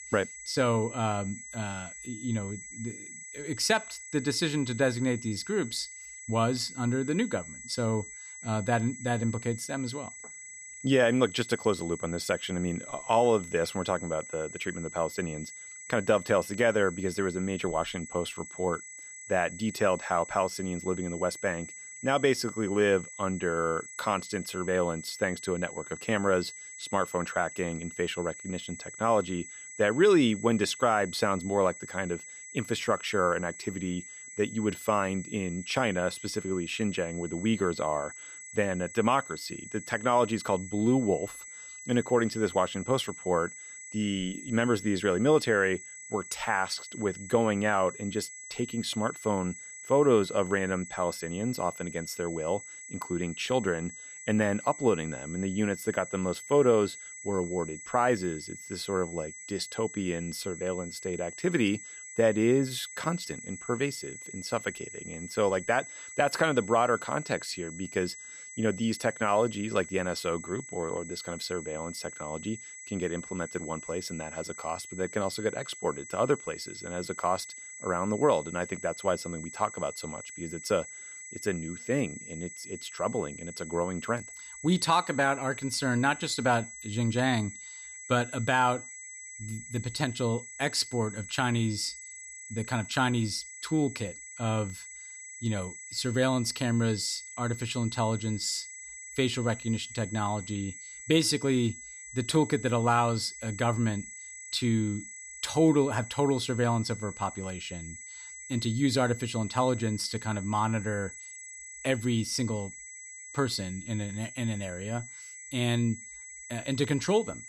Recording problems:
high-pitched whine; noticeable; throughout; 2 kHz, 10 dB below the speech

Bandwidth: 14.5 kHz